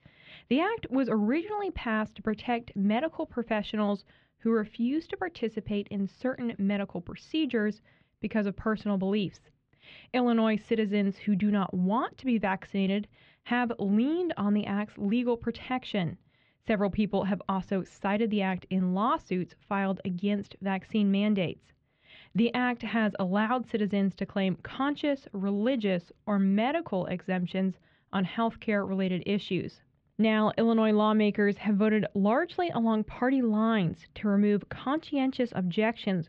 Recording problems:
muffled; very; fading above 3.5 kHz

